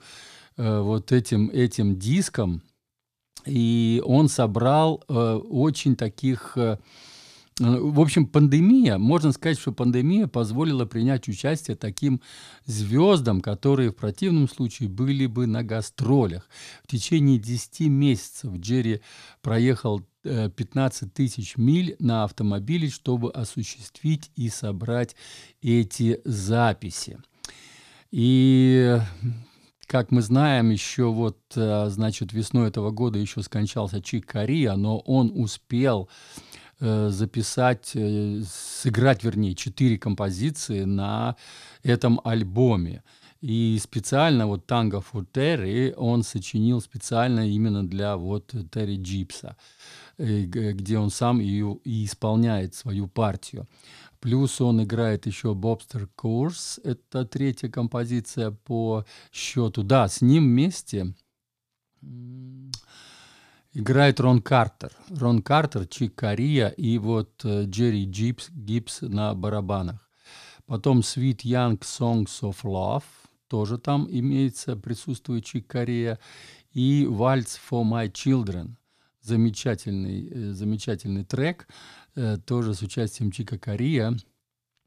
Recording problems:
none

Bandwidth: 14.5 kHz